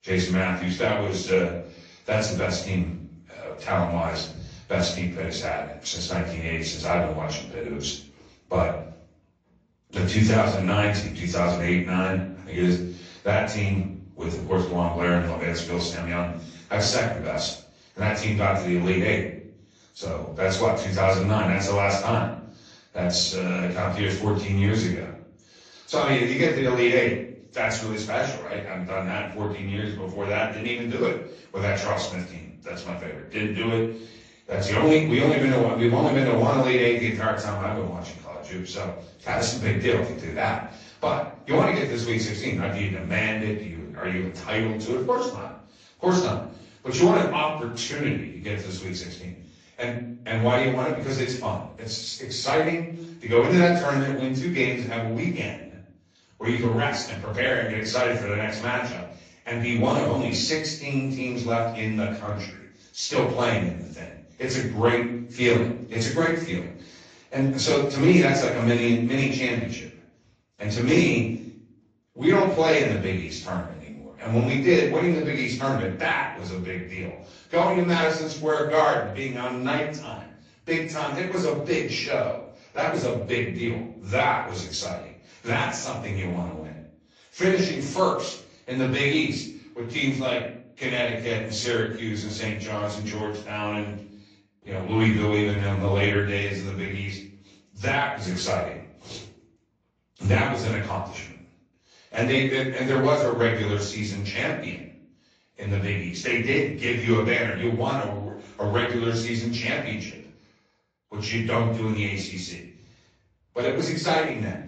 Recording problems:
off-mic speech; far
room echo; noticeable; dies away in 0.5 s
garbled, watery; slightly; nothing above 7.5 kHz

